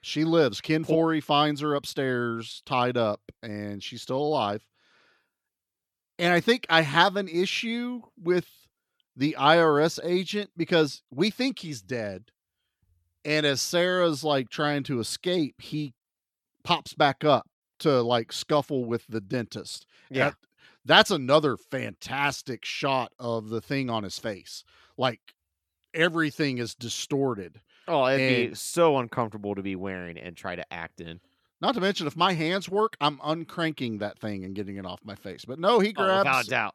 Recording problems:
none

